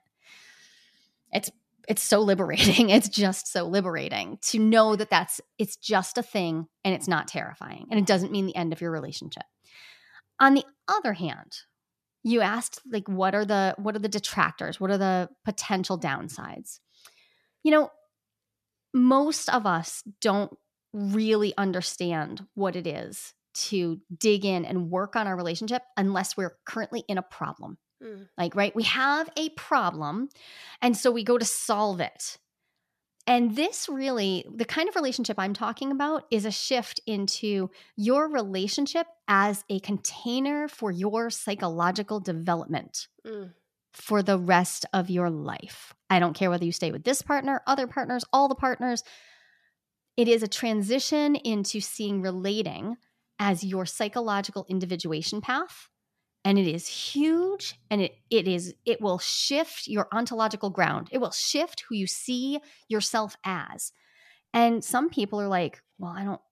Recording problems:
none

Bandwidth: 14.5 kHz